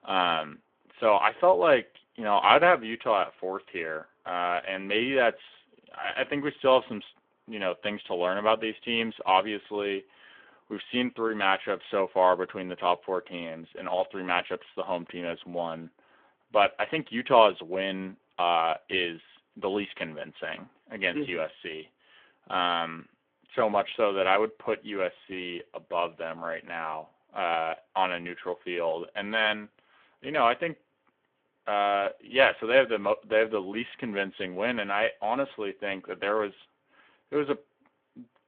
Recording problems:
phone-call audio

